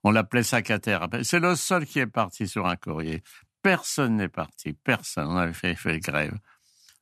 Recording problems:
none

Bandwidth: 14 kHz